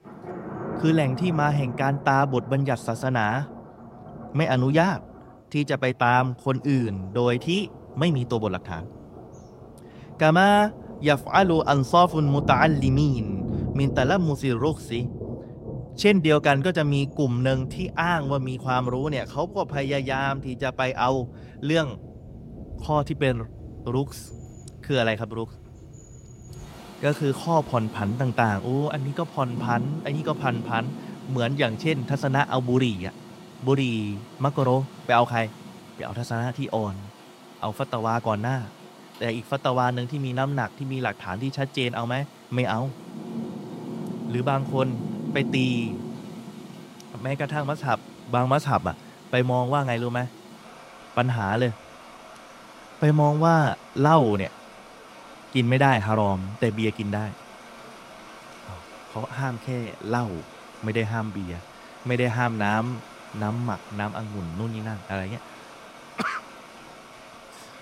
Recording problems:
rain or running water; noticeable; throughout; 15 dB below the speech

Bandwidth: 16 kHz